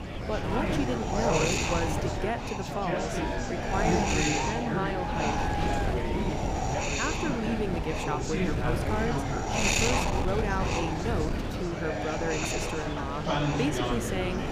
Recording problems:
murmuring crowd; very loud; throughout; 1 dB above the speech
wind noise on the microphone; heavy; 2 dB above the speech

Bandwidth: 15.5 kHz